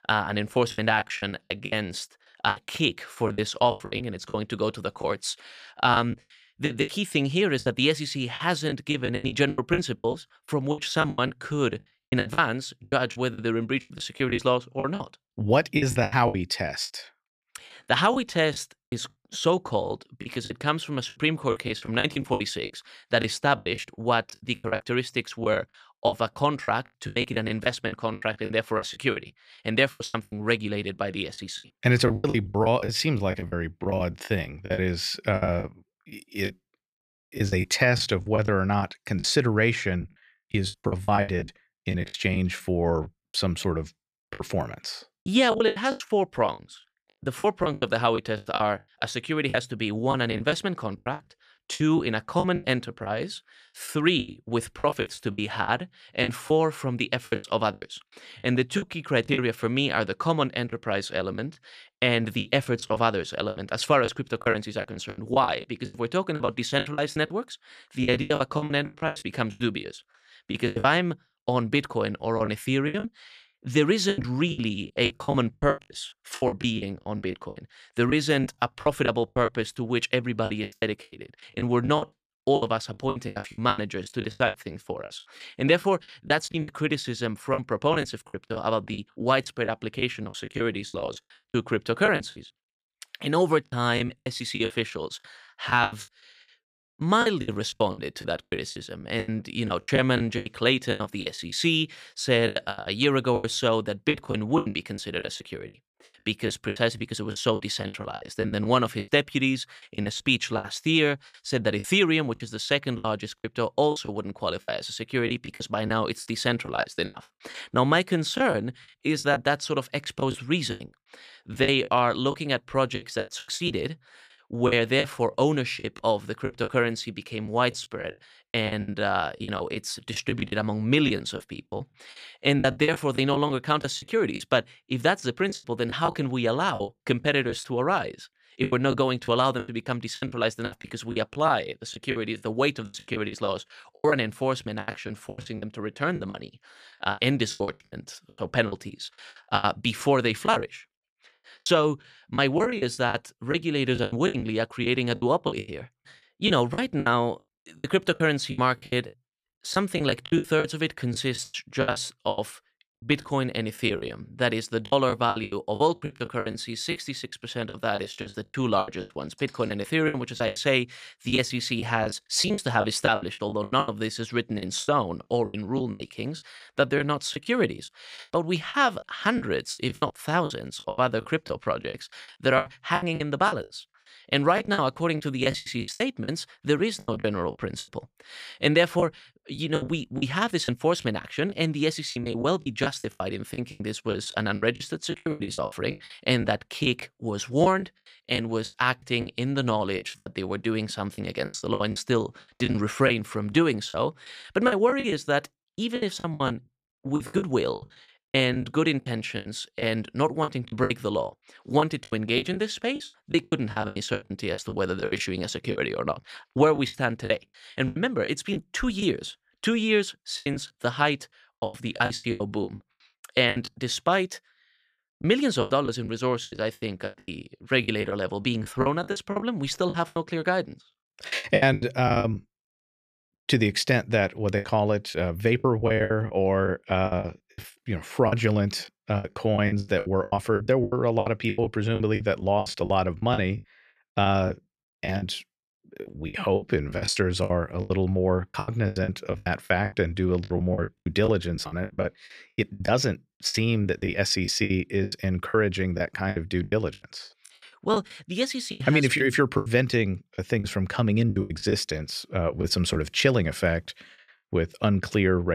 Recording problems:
choppy; very; 16% of the speech affected
abrupt cut into speech; at the end

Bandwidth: 14.5 kHz